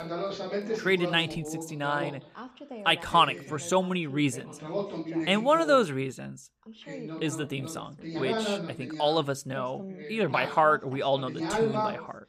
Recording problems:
background chatter; loud; throughout; 2 voices, 8 dB below the speech

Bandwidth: 15 kHz